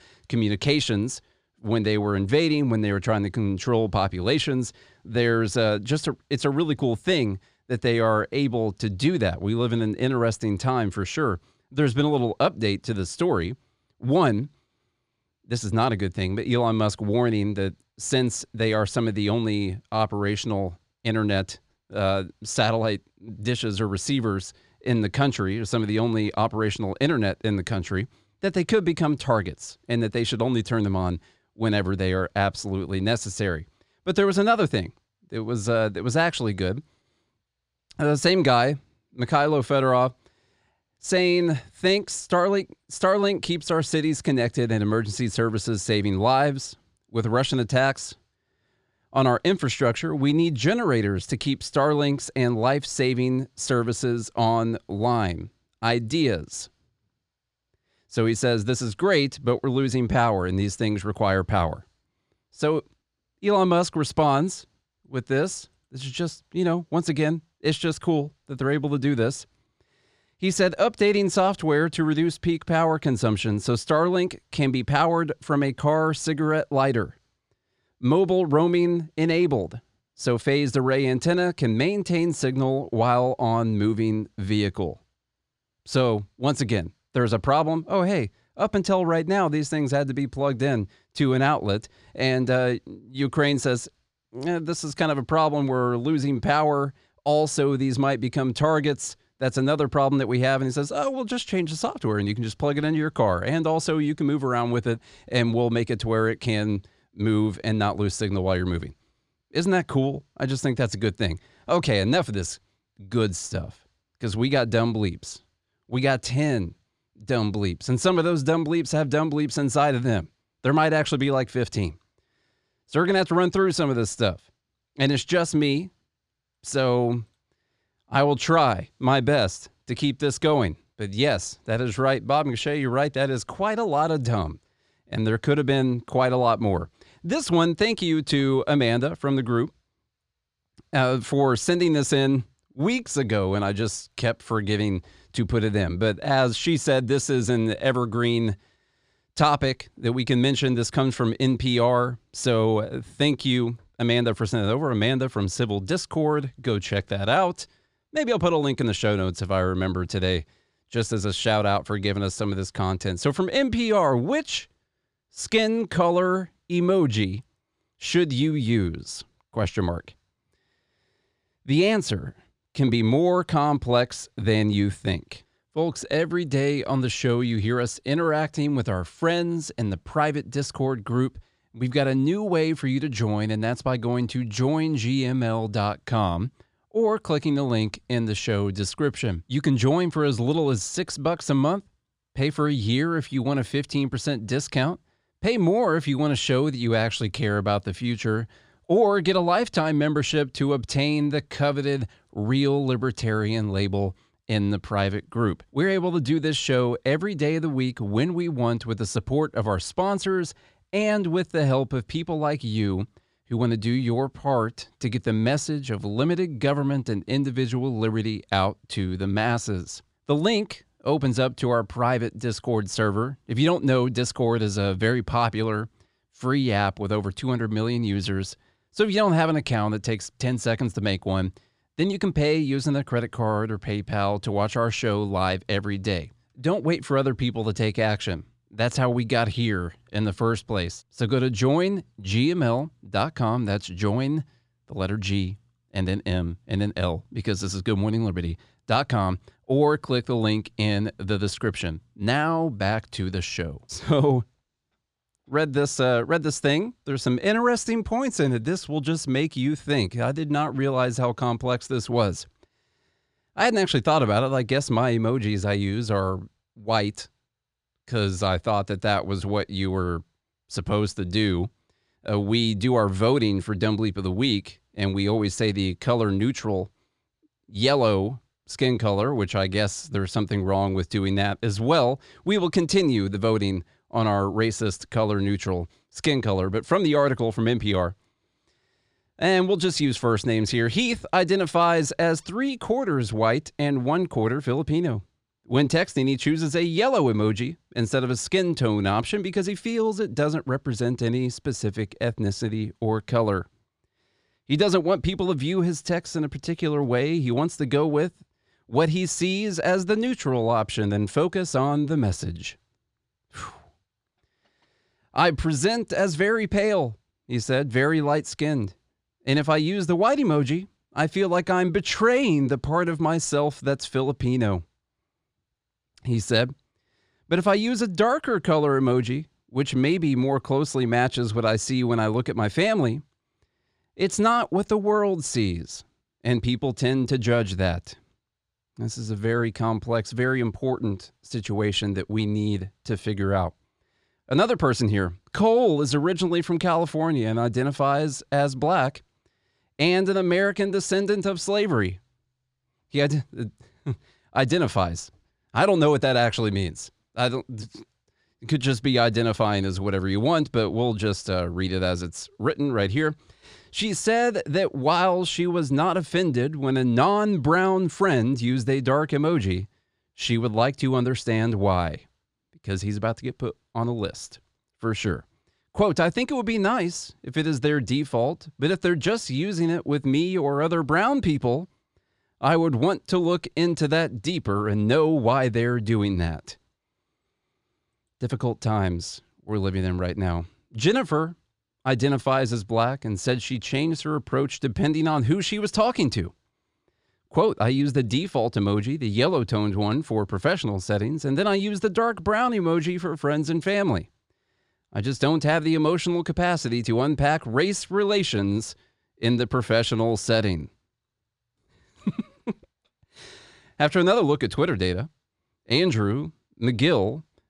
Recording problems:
none

